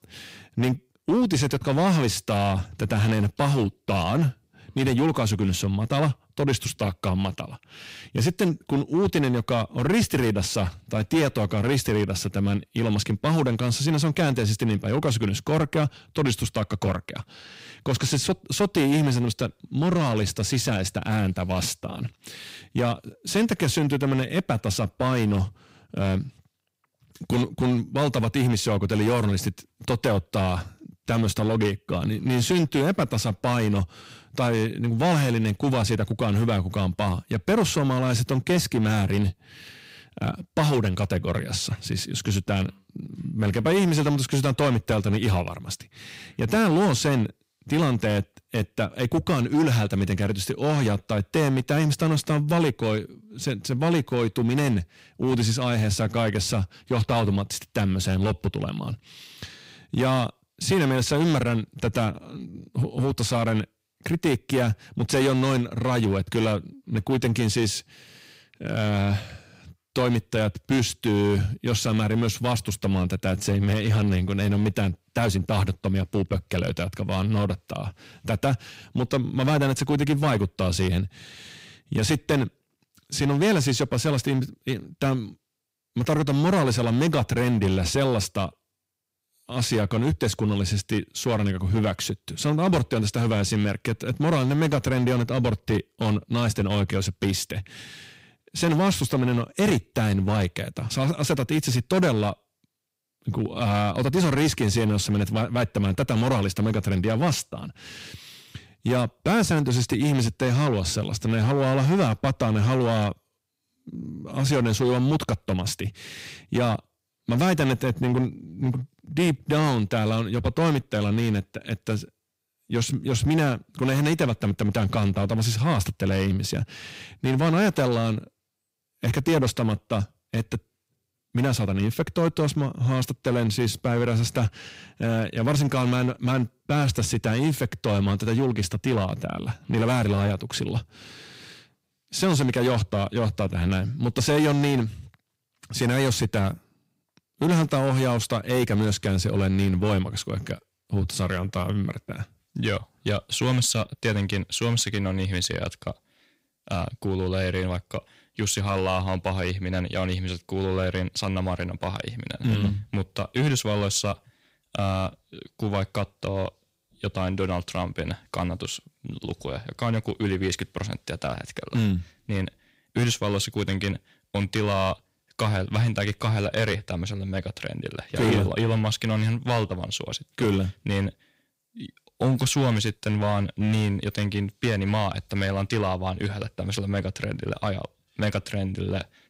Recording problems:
distortion; slight; 6% of the sound clipped

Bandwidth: 15.5 kHz